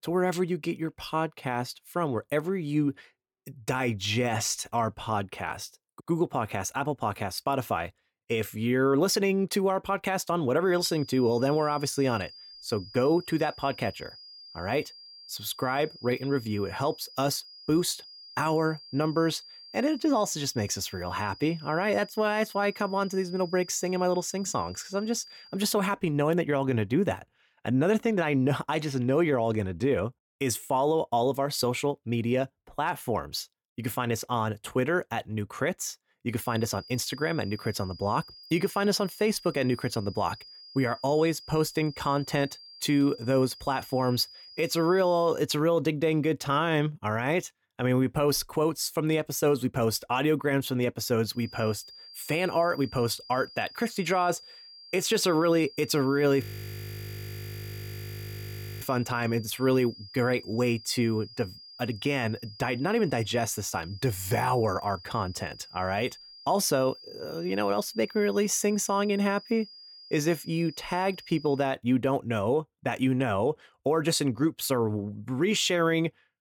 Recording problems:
high-pitched whine; noticeable; from 11 to 26 s, from 36 to 45 s and from 51 s to 1:12; 5 kHz, 20 dB below the speech
audio freezing; at 56 s for 2.5 s

